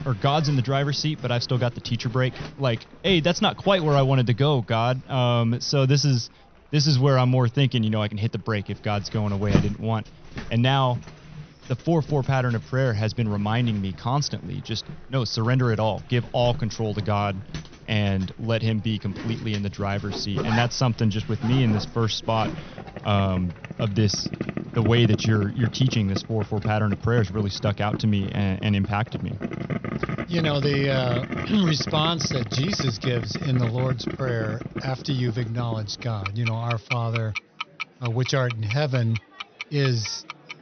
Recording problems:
high frequencies cut off; noticeable; nothing above 6 kHz
household noises; loud; throughout; 10 dB below the speech
murmuring crowd; faint; throughout; 30 dB below the speech

